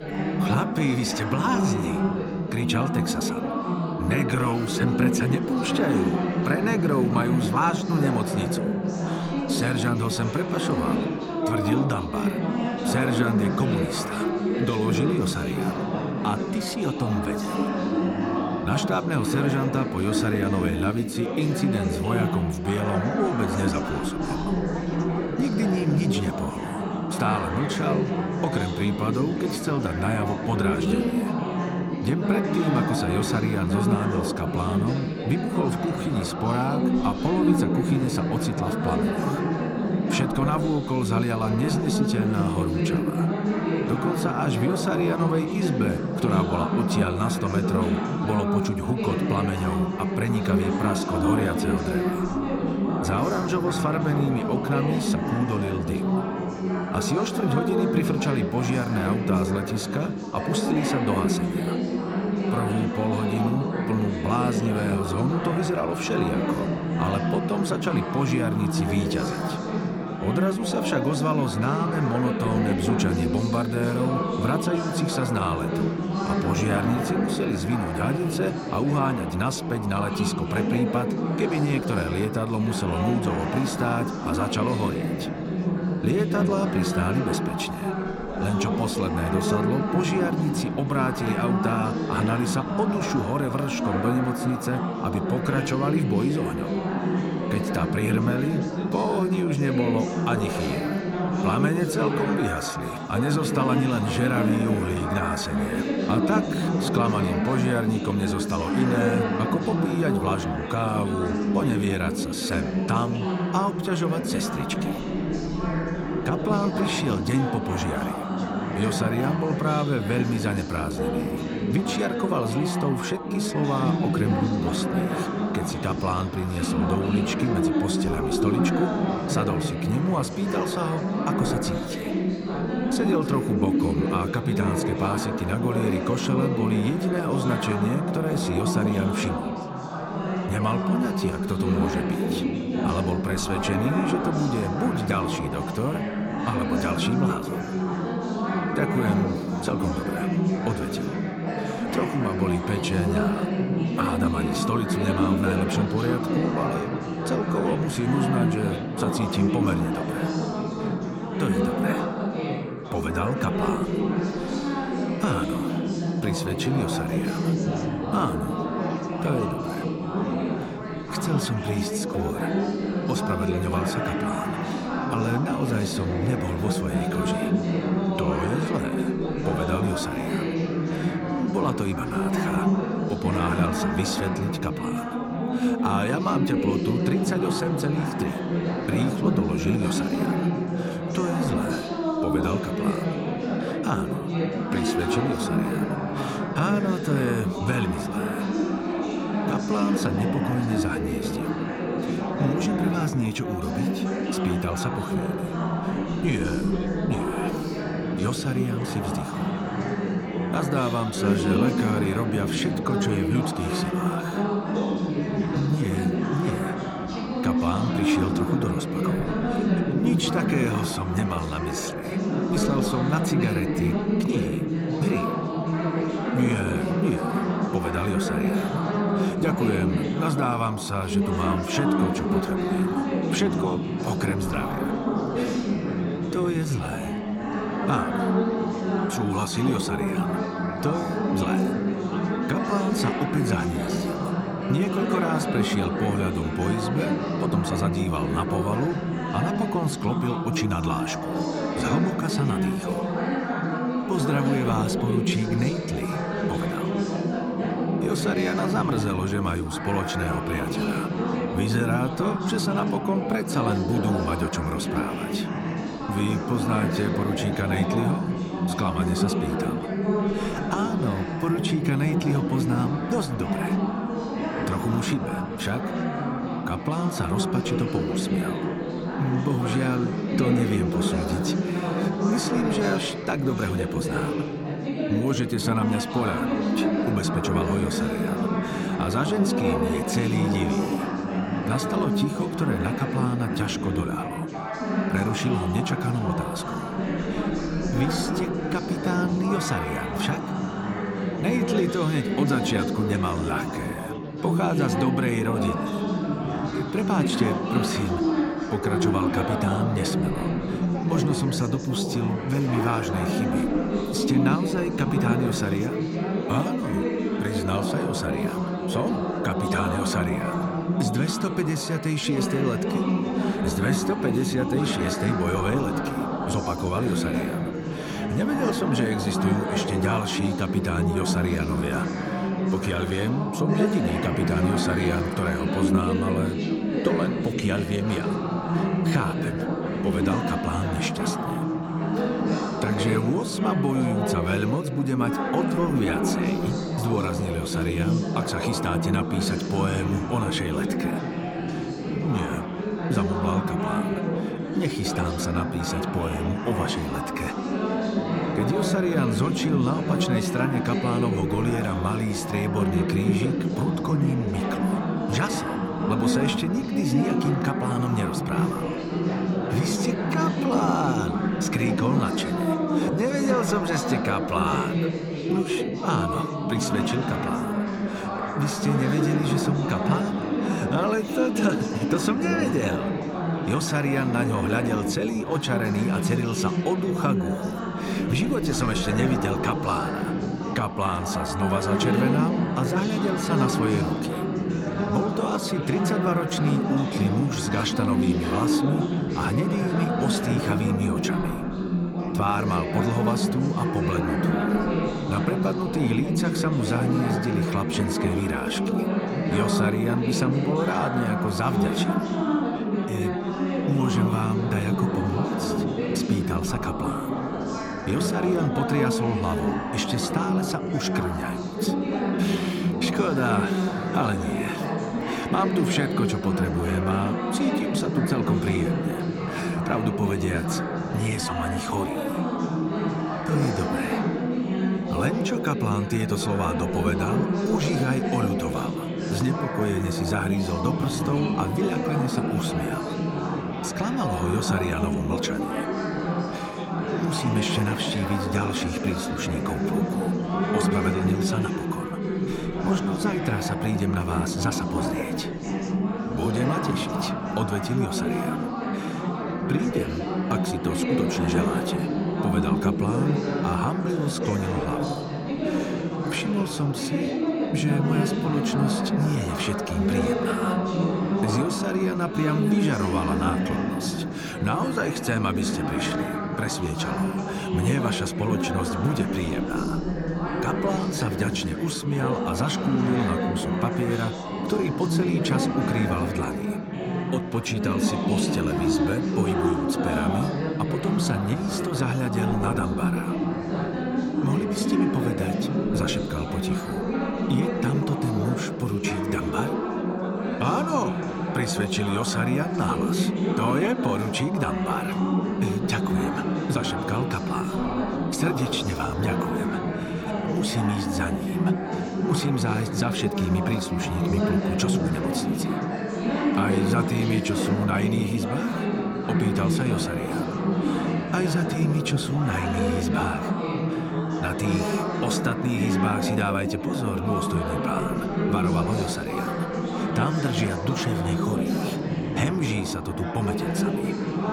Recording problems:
chatter from many people; very loud; throughout; 1 dB above the speech

